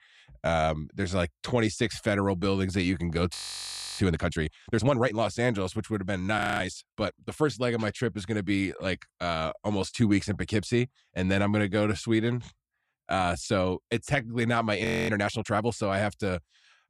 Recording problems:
audio freezing; at 3.5 s for 0.5 s, at 6.5 s and at 15 s

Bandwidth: 14.5 kHz